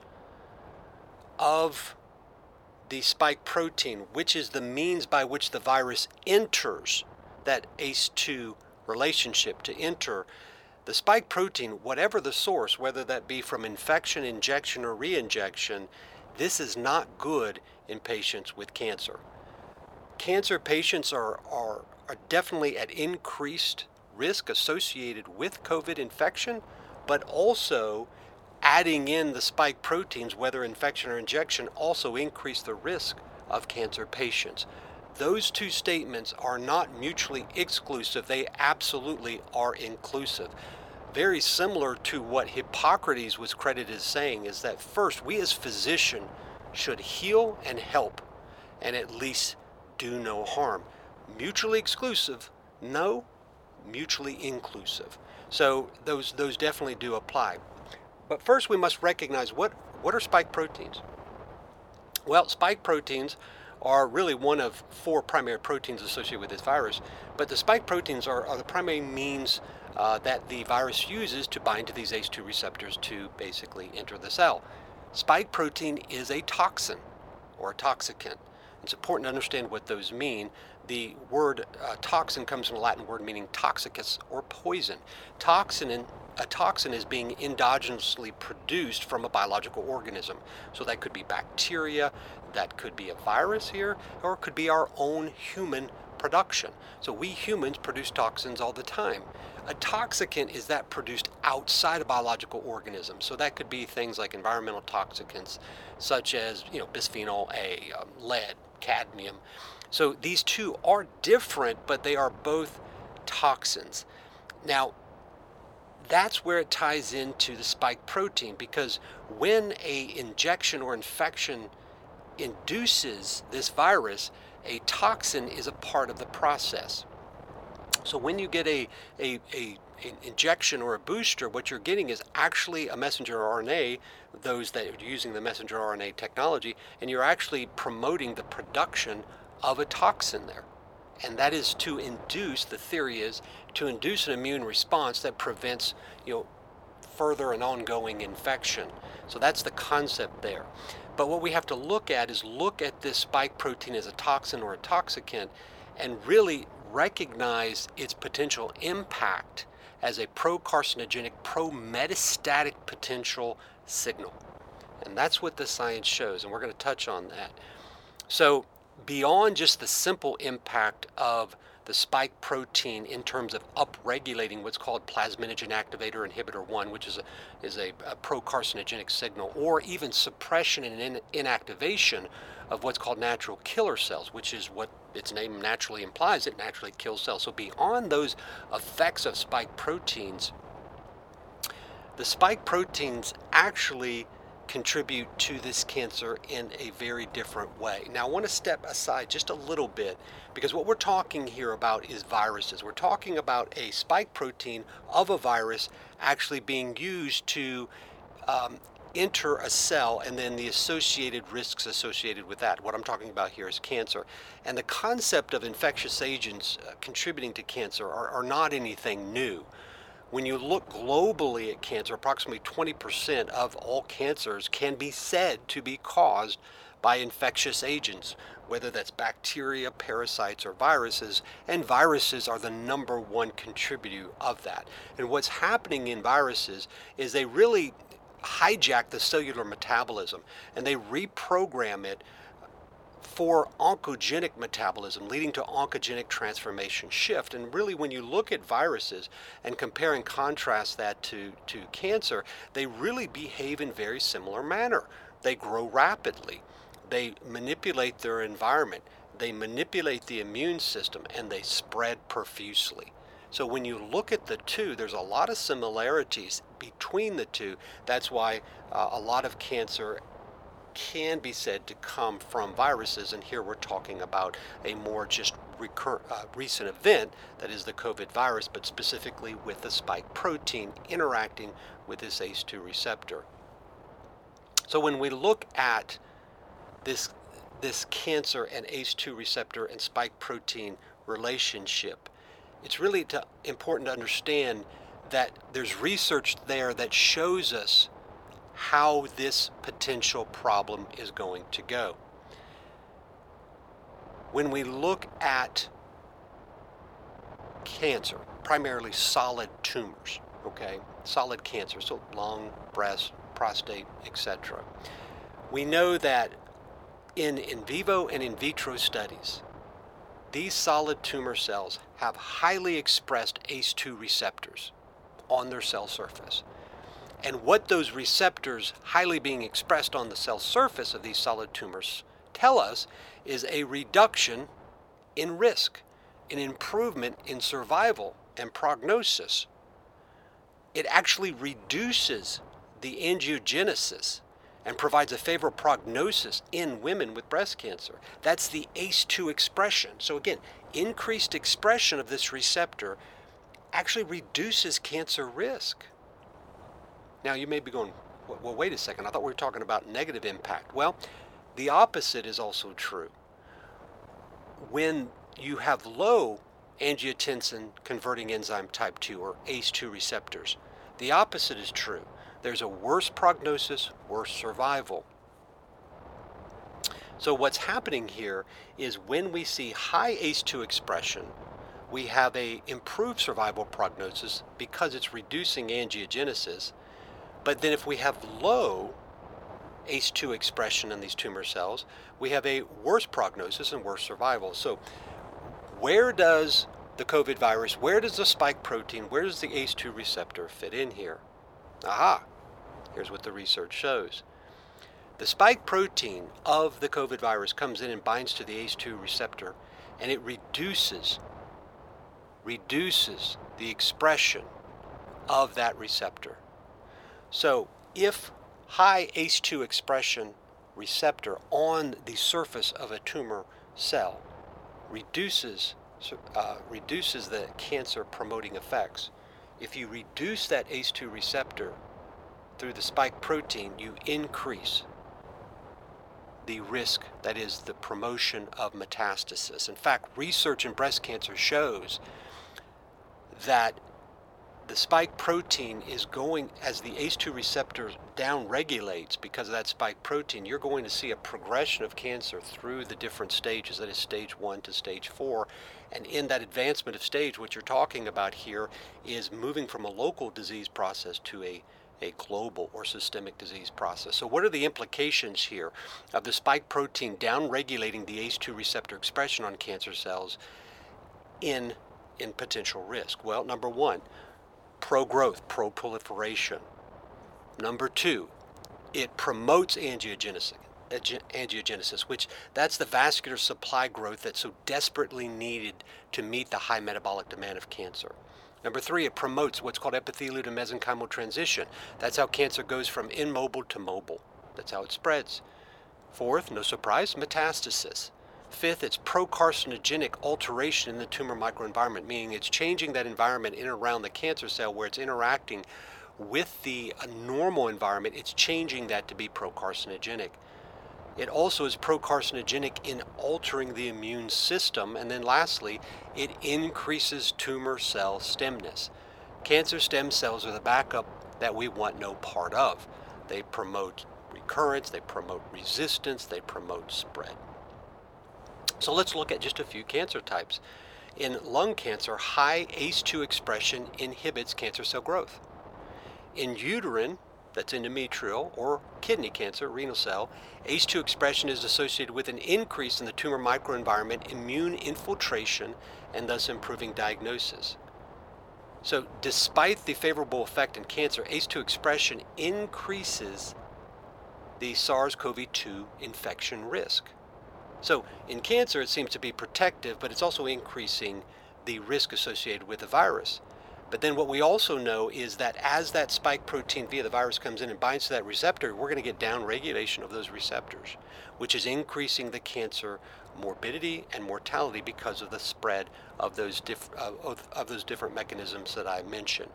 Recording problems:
thin; very; fading below 700 Hz
wind noise on the microphone; occasional gusts; 20 dB below the speech

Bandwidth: 17.5 kHz